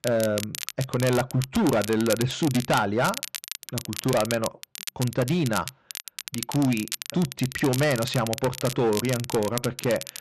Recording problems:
distortion; slight; 8% of the sound clipped
crackle, like an old record; loud; 9 dB below the speech

